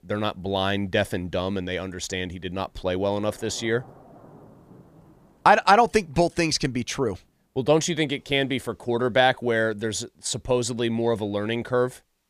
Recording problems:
rain or running water; faint; throughout; 25 dB below the speech

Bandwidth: 15 kHz